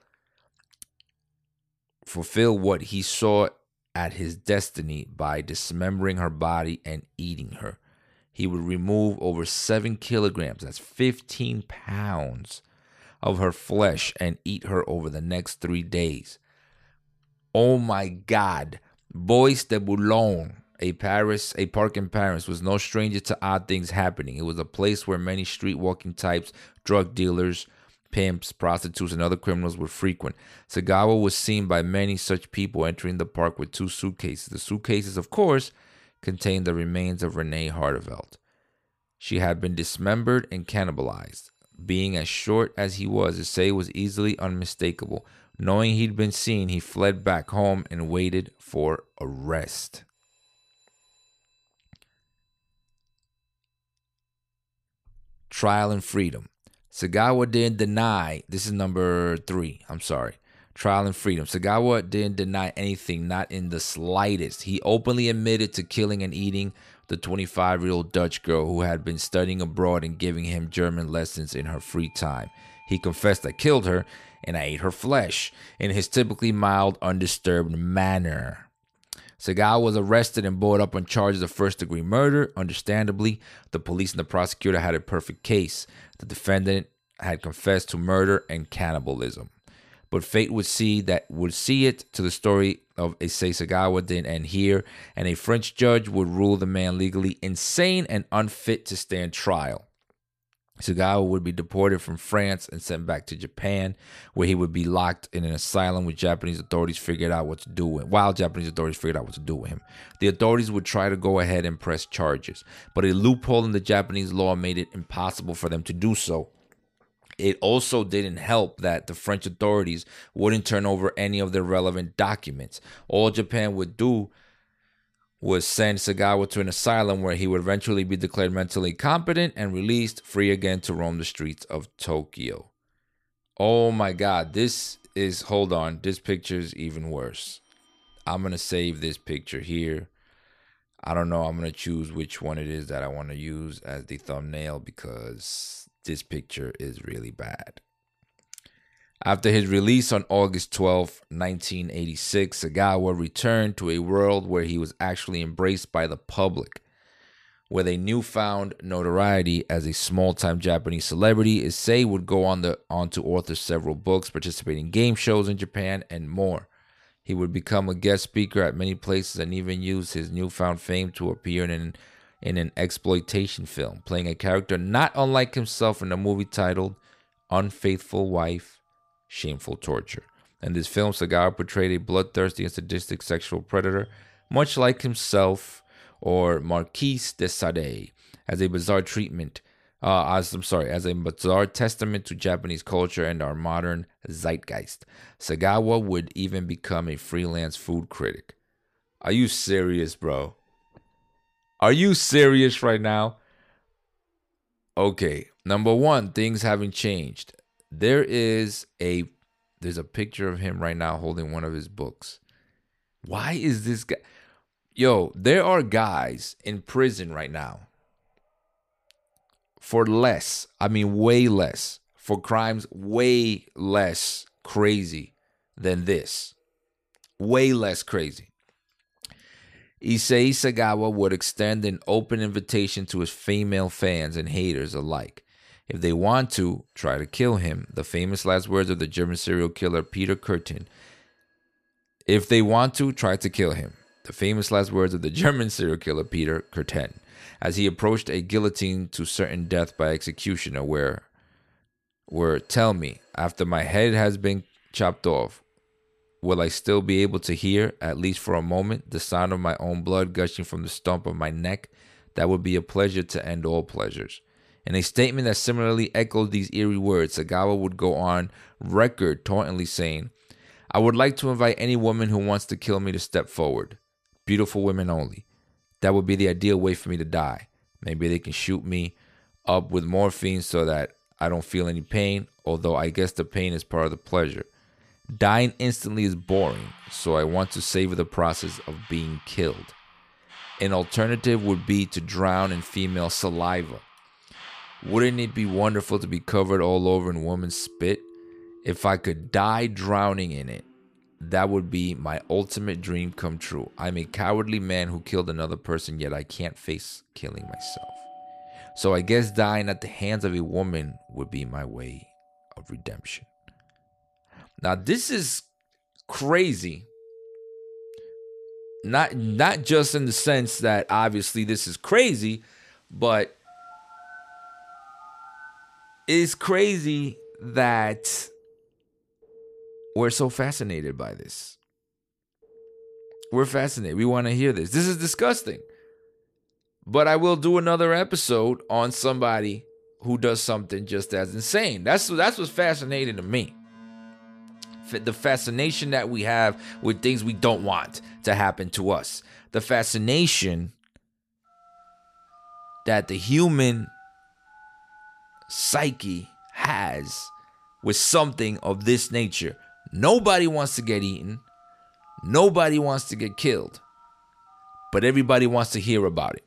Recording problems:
alarms or sirens; faint; throughout; 25 dB below the speech

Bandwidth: 14.5 kHz